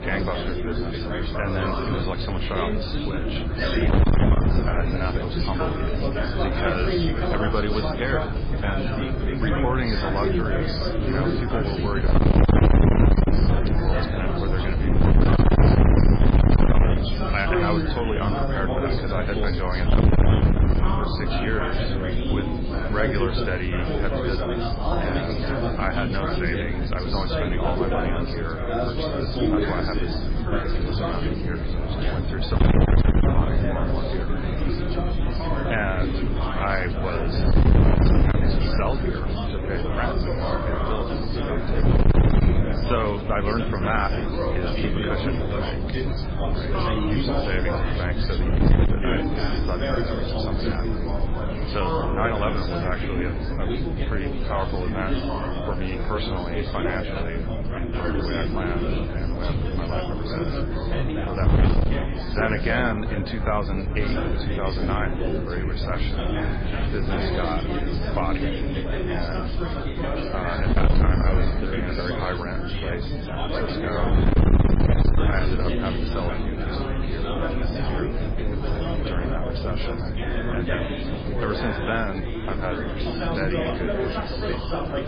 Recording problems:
distortion; heavy; 7% of the sound clipped
garbled, watery; badly; nothing above 4.5 kHz
chatter from many people; very loud; throughout; 2 dB above the speech
wind noise on the microphone; heavy; 3 dB below the speech

